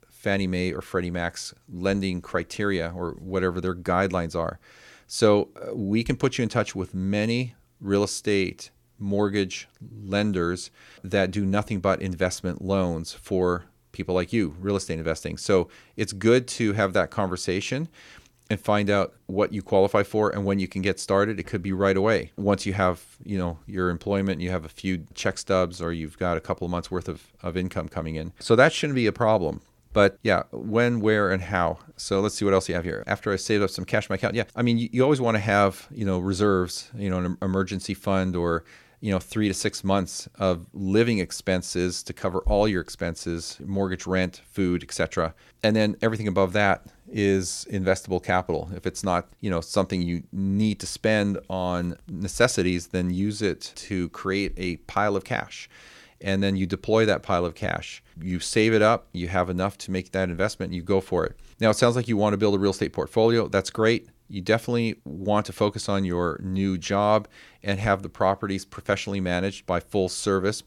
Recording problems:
none

